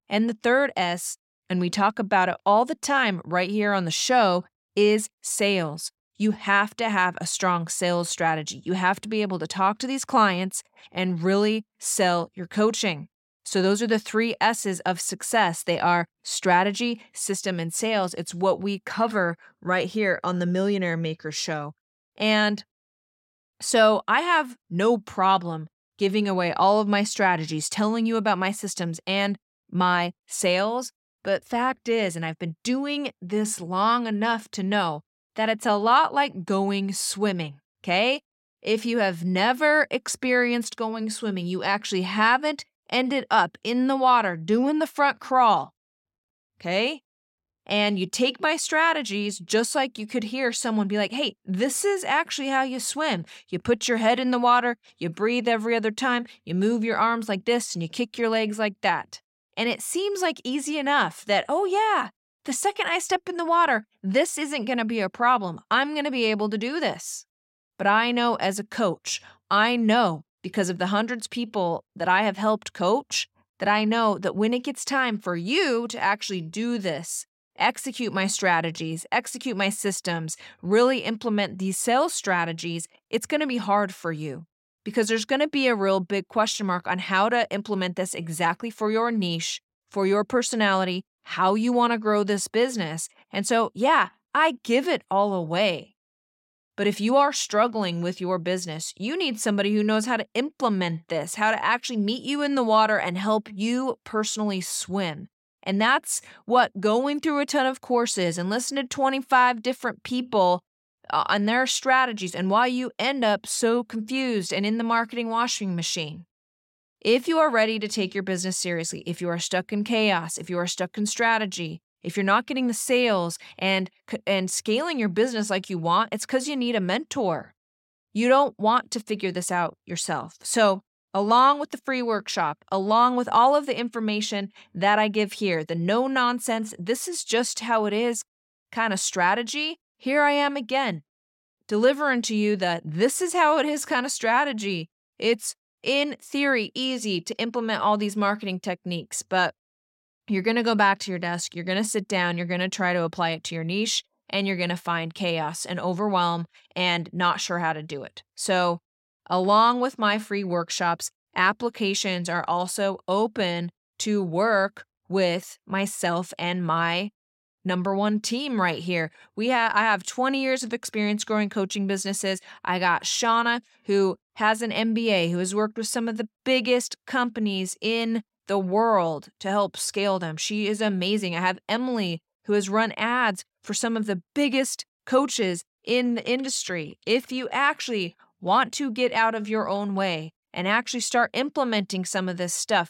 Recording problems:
none

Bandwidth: 16.5 kHz